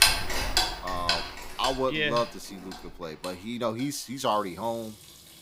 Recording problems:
household noises; very loud; throughout; 2 dB above the speech

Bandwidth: 15.5 kHz